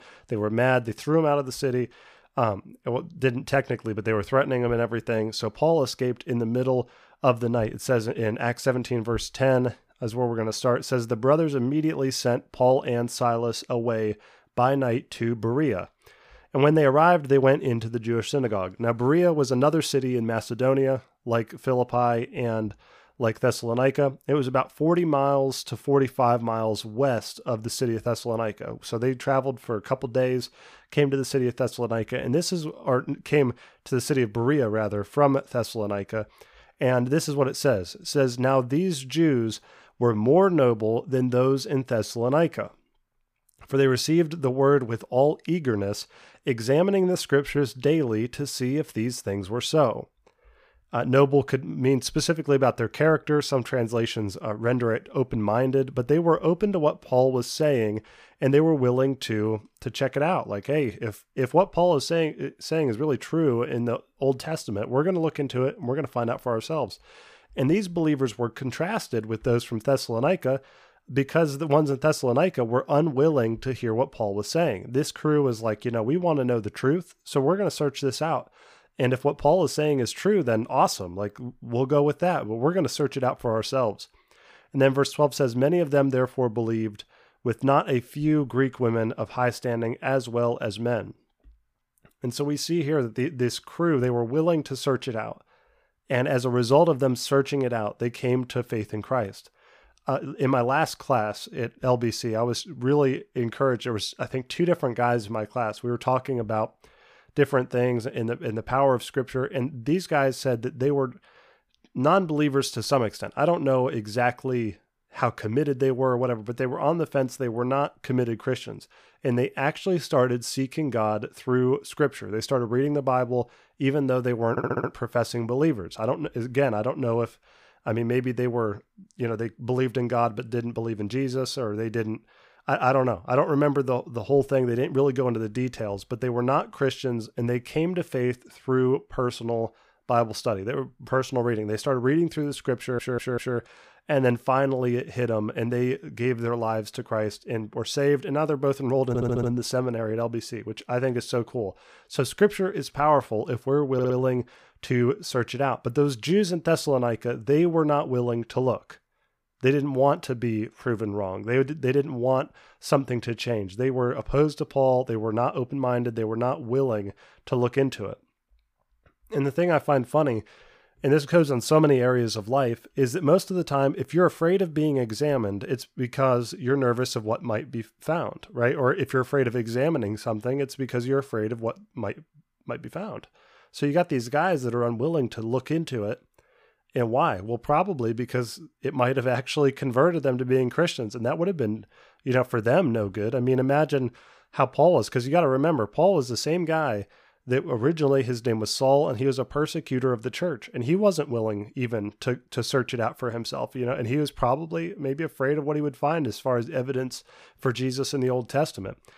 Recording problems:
audio stuttering; 4 times, first at 2:05

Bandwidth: 15 kHz